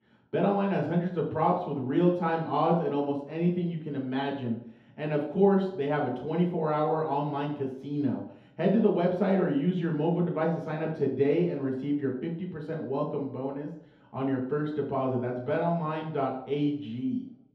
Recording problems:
off-mic speech; far
room echo; noticeable; dies away in 2.1 s

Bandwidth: 13.5 kHz